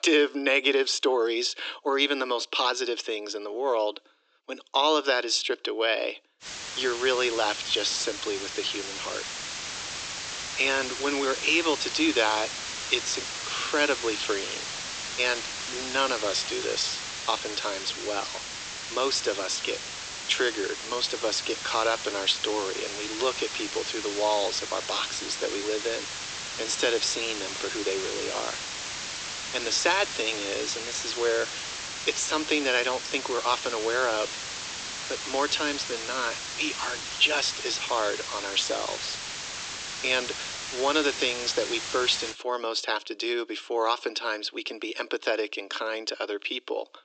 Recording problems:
thin; very; fading below 300 Hz
high frequencies cut off; noticeable; nothing above 8 kHz
hiss; loud; from 6.5 to 42 s; 6 dB below the speech

